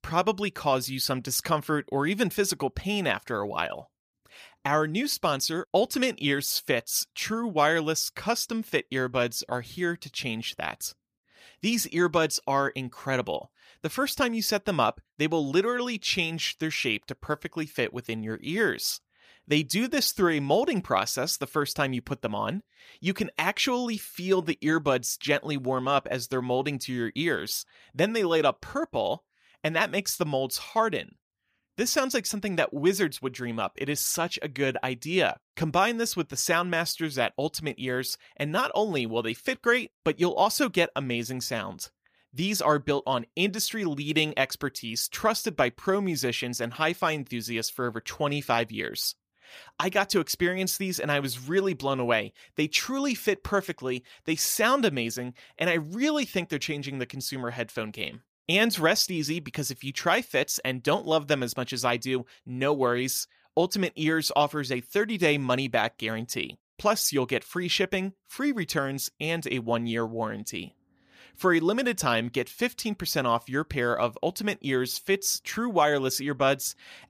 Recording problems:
none

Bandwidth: 15 kHz